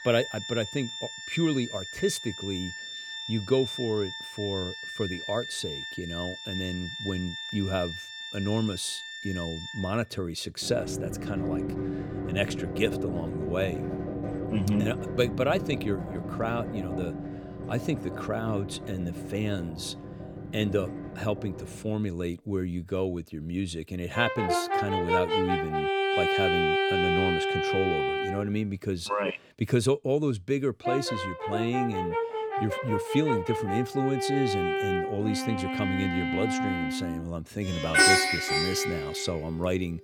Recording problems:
background music; very loud; throughout; as loud as the speech

